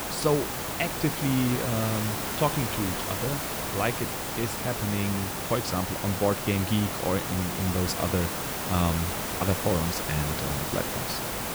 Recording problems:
hiss; loud; throughout; 1 dB below the speech

